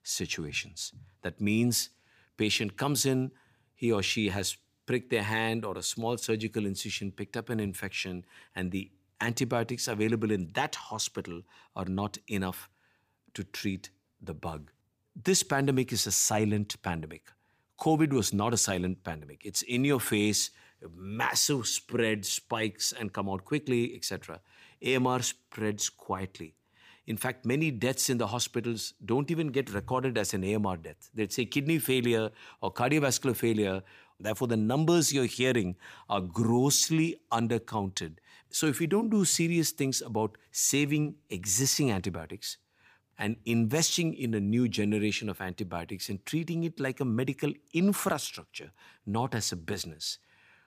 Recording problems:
none

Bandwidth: 15 kHz